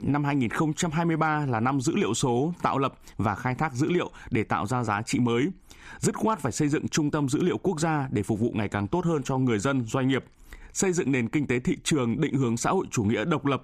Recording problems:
squashed, flat; somewhat

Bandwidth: 15 kHz